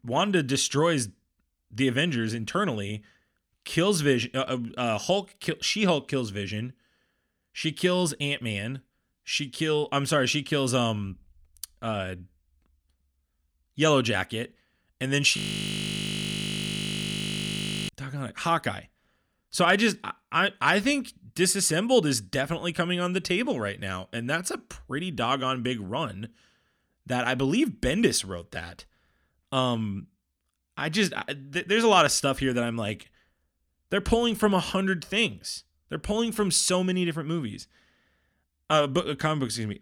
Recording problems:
audio freezing; at 15 s for 2.5 s

